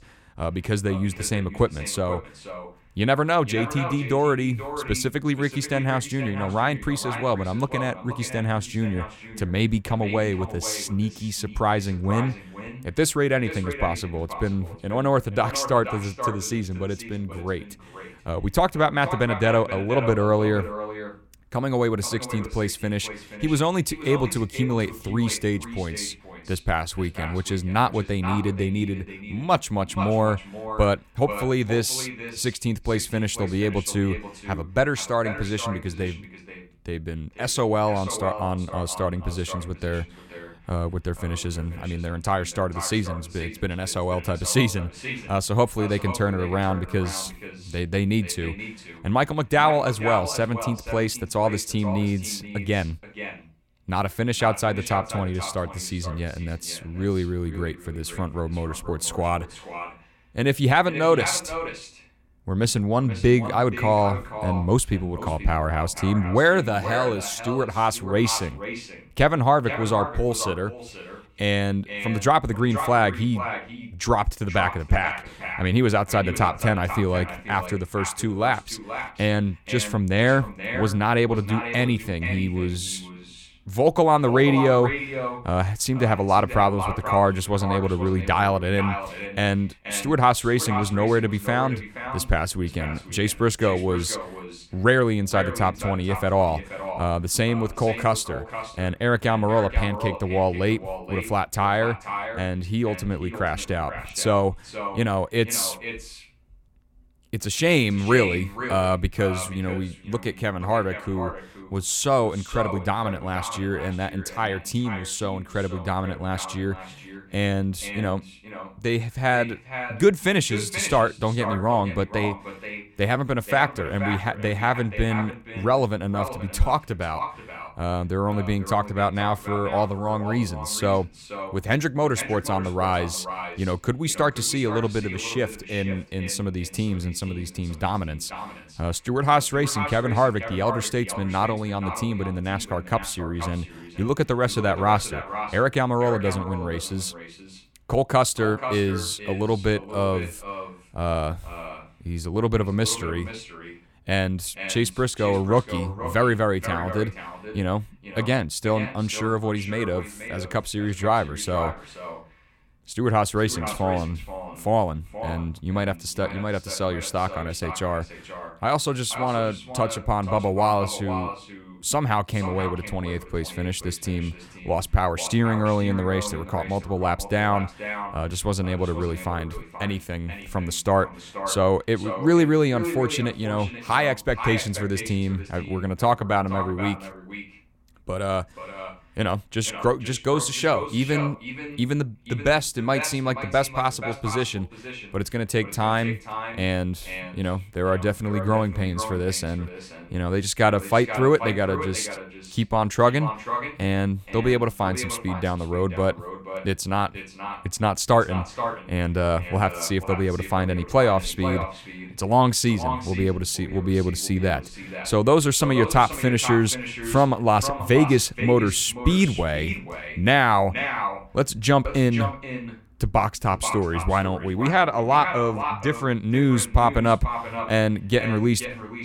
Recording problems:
echo of what is said; strong; throughout; 480 ms later, 10 dB below the speech

